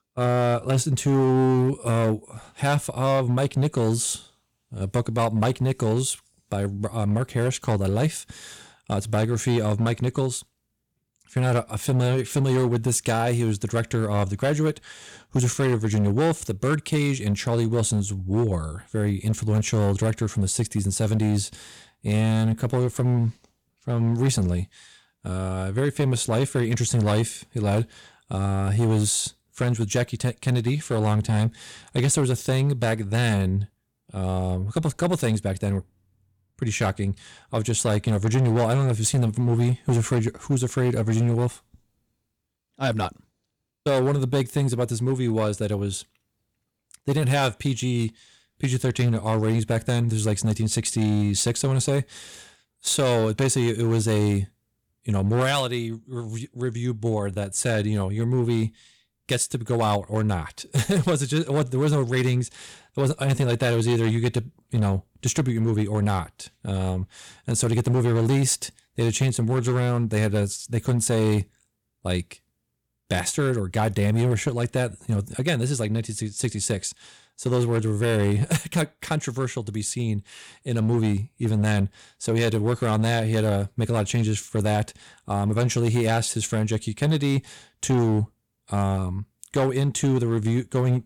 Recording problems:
distortion; slight; 8% of the sound clipped

